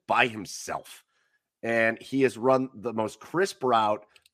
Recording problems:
none

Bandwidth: 14.5 kHz